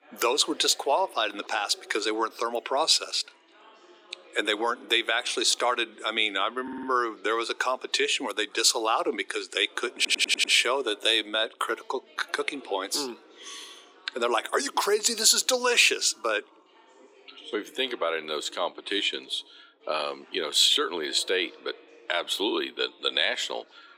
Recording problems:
thin; very; fading below 300 Hz
background chatter; faint; throughout; 4 voices, 25 dB below the speech
audio stuttering; at 6.5 s and at 10 s

